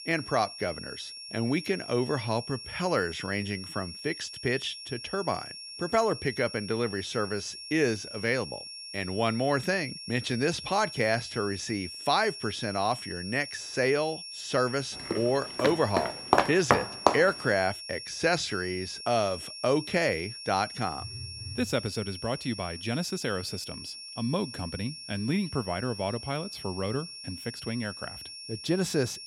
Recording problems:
high-pitched whine; loud; throughout; 5.5 kHz, 9 dB below the speech
footsteps; loud; from 15 to 17 s; peak 5 dB above the speech
phone ringing; faint; at 21 s; peak 15 dB below the speech

